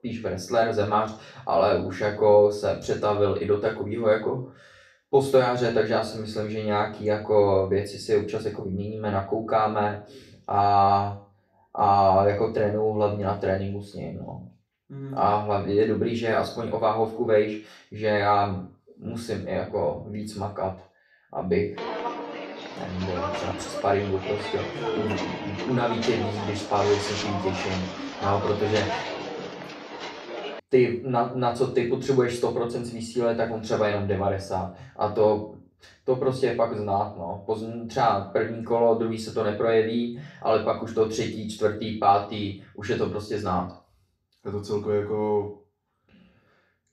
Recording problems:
off-mic speech; far
room echo; slight; dies away in 0.4 s
footsteps; noticeable; from 22 to 31 s; peak 3 dB below the speech

